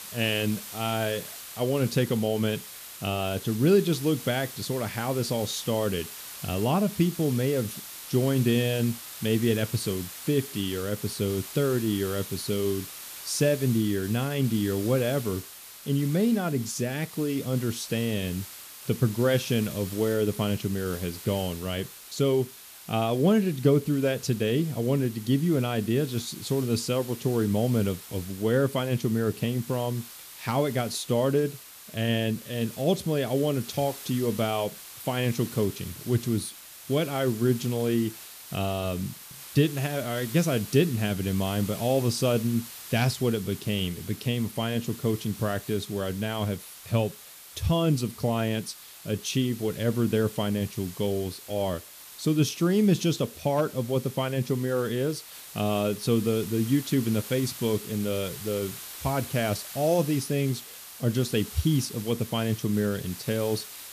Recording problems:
hiss; noticeable; throughout; 15 dB below the speech

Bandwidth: 14.5 kHz